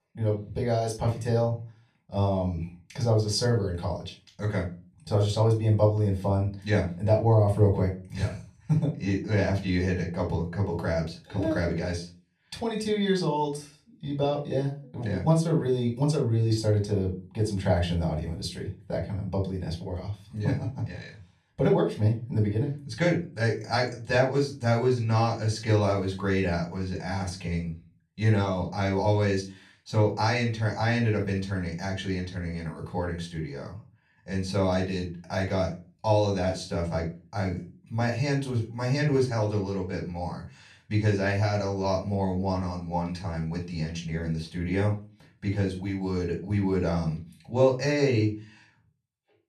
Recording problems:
off-mic speech; far
room echo; slight; dies away in 0.3 s

